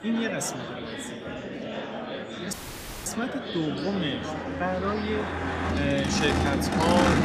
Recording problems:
traffic noise; very loud; throughout; 2 dB above the speech
murmuring crowd; loud; throughout; 4 dB below the speech
audio cutting out; at 2.5 s for 0.5 s

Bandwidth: 15 kHz